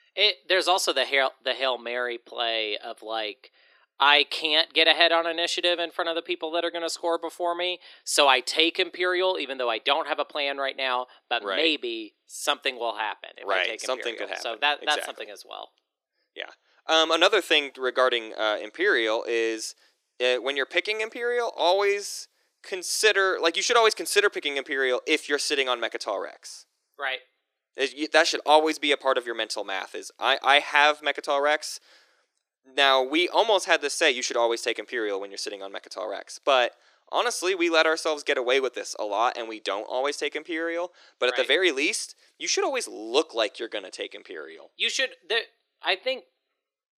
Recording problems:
thin; very; fading below 350 Hz

